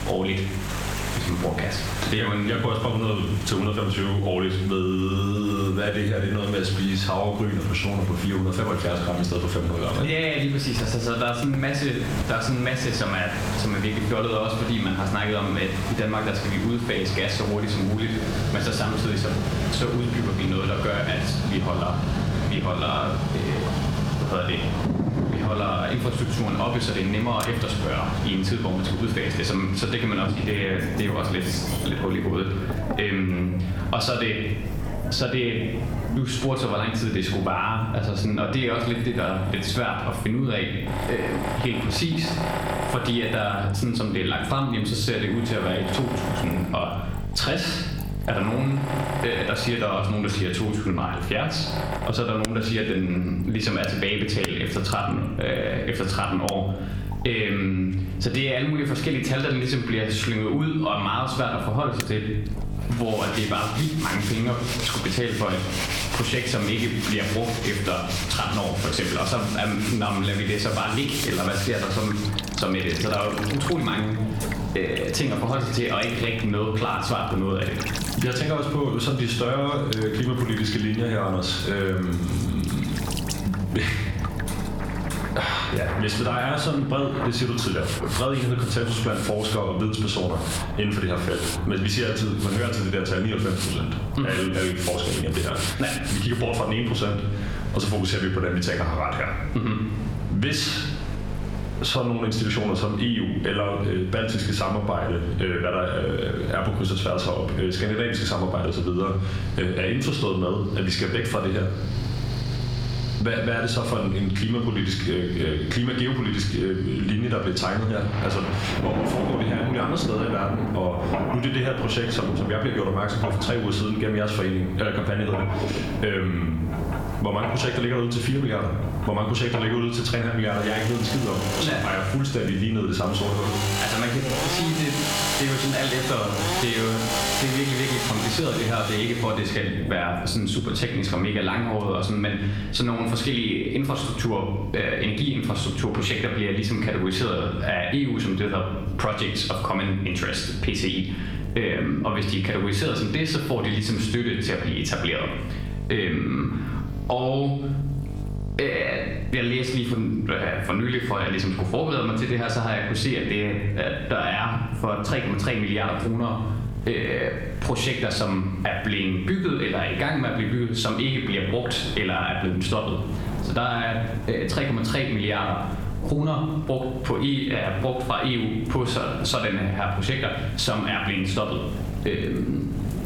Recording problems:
room echo; slight; dies away in 0.6 s
off-mic speech; somewhat distant
squashed, flat; somewhat, background pumping
machinery noise; loud; until 2:20; 7 dB below the speech
electrical hum; faint; throughout; 50 Hz, 25 dB below the speech
rain or running water; very faint; throughout; 15 dB below the speech

